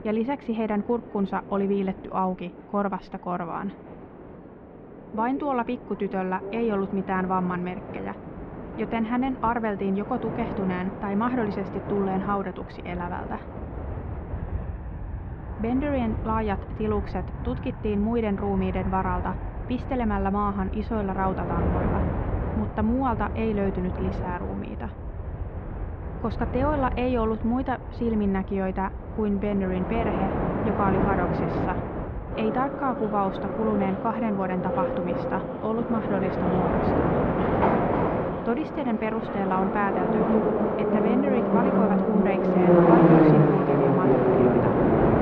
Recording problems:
muffled; very; fading above 2.5 kHz
train or aircraft noise; very loud; throughout; 1 dB above the speech

